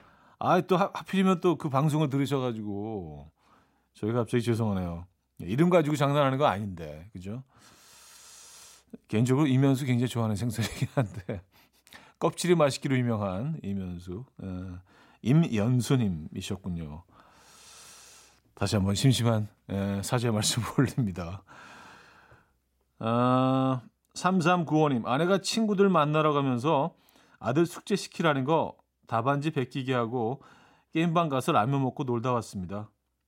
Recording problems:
none

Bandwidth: 16 kHz